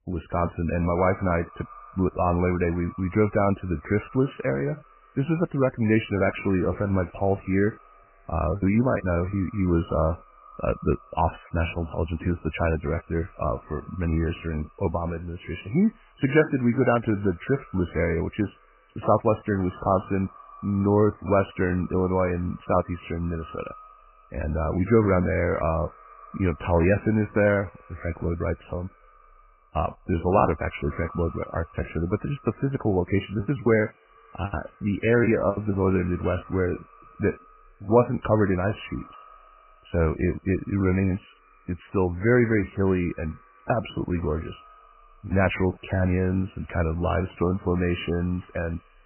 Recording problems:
garbled, watery; badly; nothing above 3 kHz
echo of what is said; faint; throughout; 110 ms later, 25 dB below the speech
choppy; very; from 8.5 to 9.5 s and from 33 to 36 s; 13% of the speech affected

